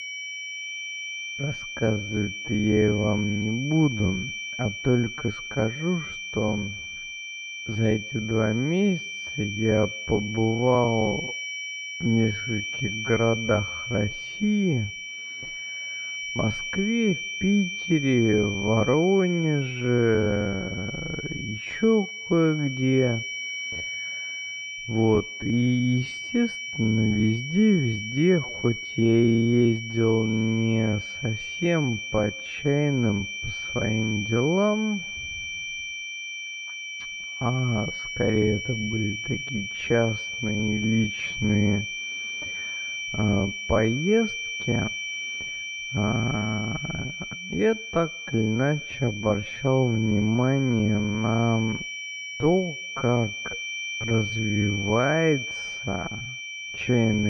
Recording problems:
muffled; very; fading above 2.5 kHz
wrong speed, natural pitch; too slow; 0.5 times normal speed
high-pitched whine; loud; throughout; 2.5 kHz, 6 dB below the speech
abrupt cut into speech; at the end

